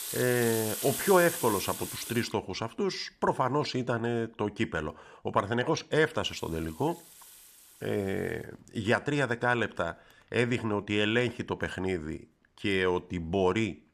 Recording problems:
household noises; loud; throughout; 7 dB below the speech

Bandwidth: 14.5 kHz